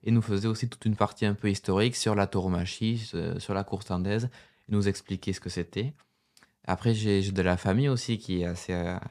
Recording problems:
none

